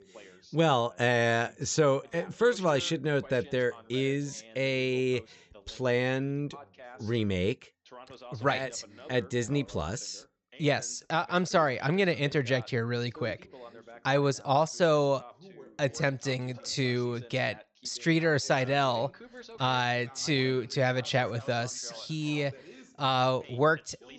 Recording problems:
high frequencies cut off; noticeable; nothing above 8 kHz
background chatter; faint; throughout; 2 voices, 20 dB below the speech

